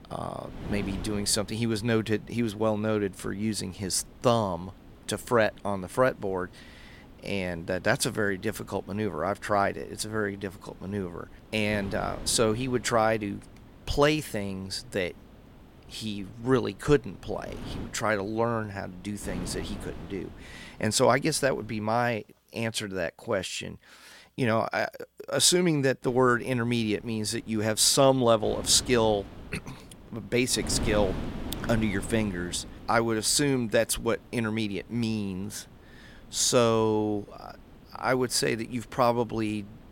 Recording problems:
wind noise on the microphone; occasional gusts; until 22 s and from 26 s on; 20 dB below the speech

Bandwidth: 16 kHz